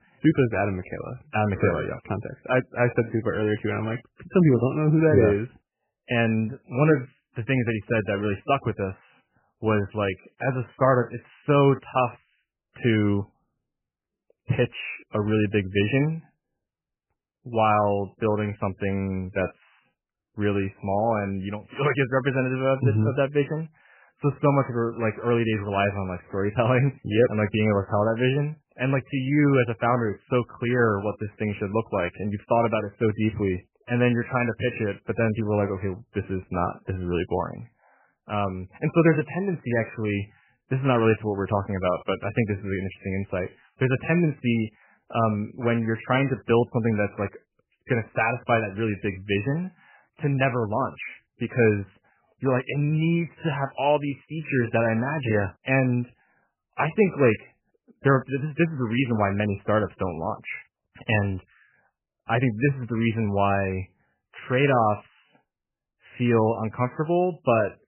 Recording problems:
garbled, watery; badly; nothing above 3 kHz

